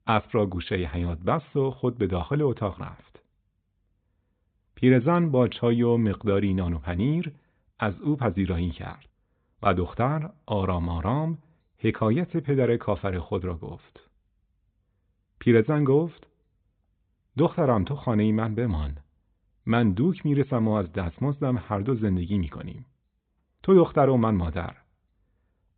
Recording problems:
high frequencies cut off; severe; nothing above 4 kHz

